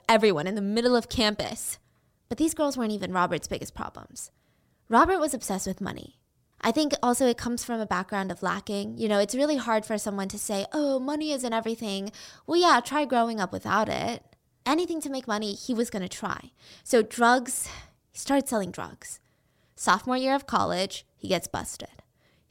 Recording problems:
none

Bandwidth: 16.5 kHz